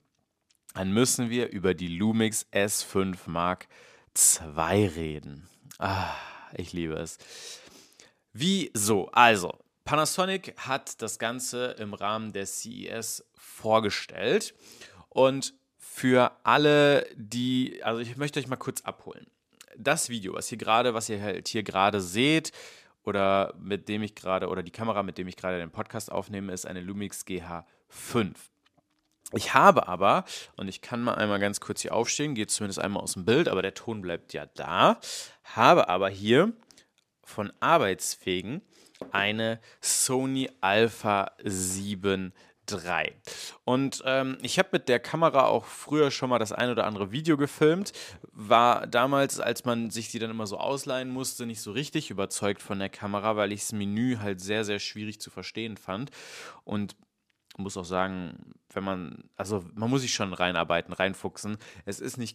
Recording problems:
none

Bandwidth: 15 kHz